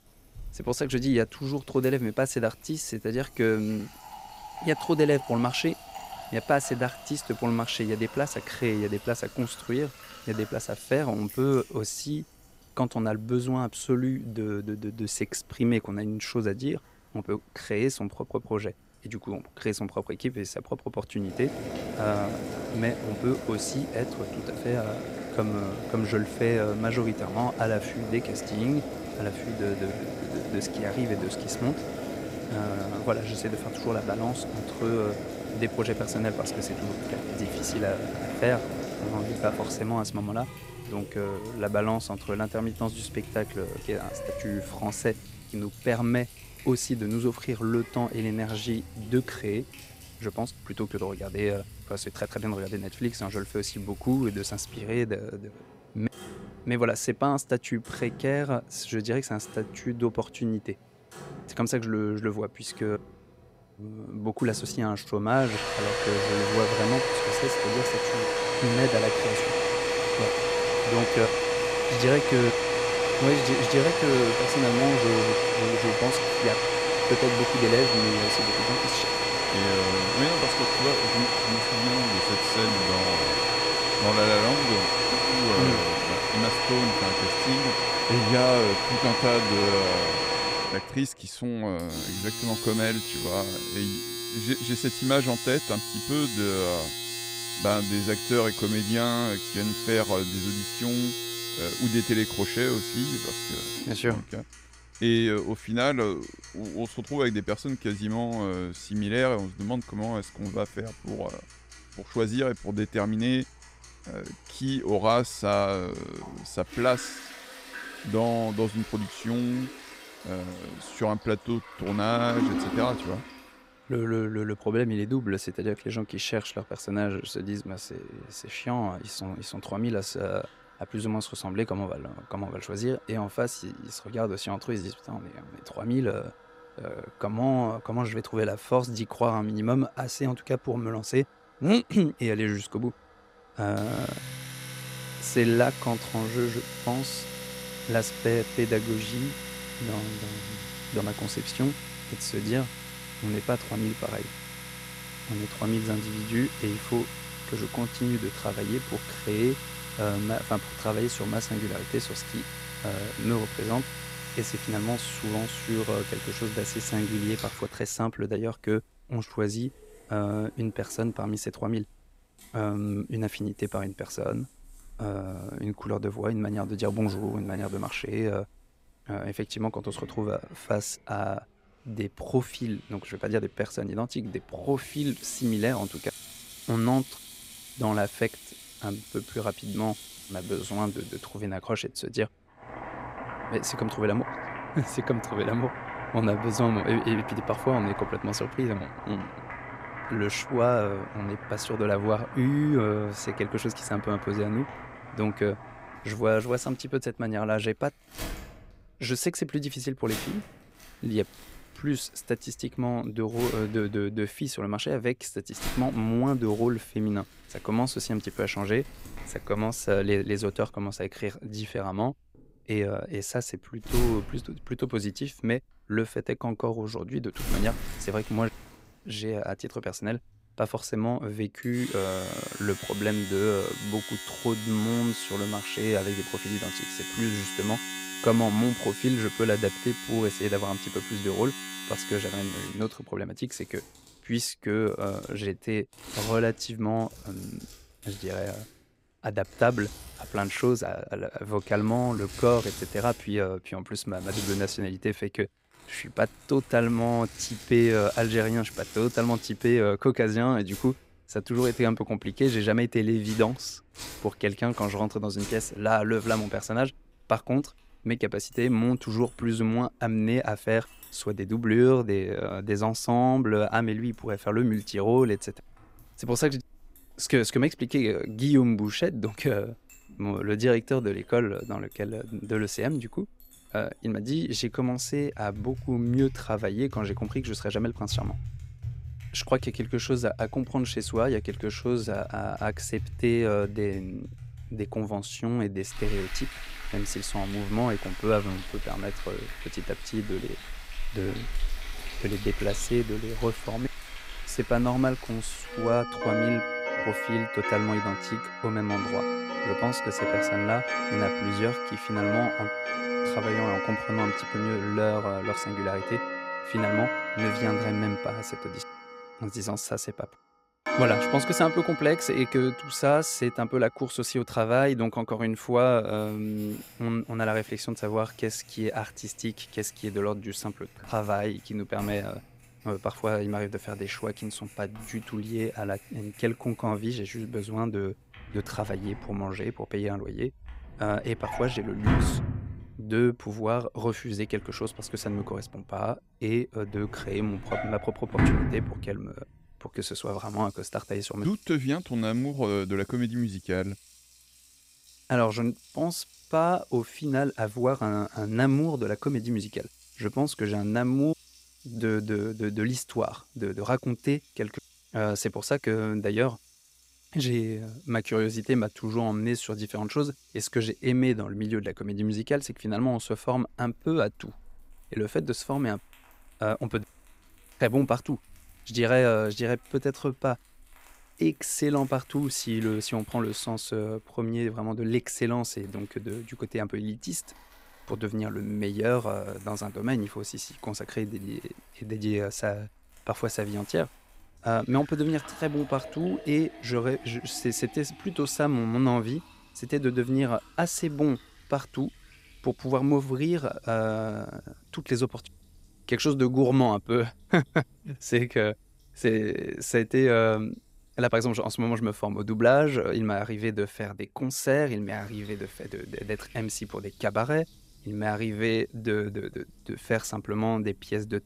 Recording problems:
household noises; loud; throughout; 2 dB below the speech

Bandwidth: 15.5 kHz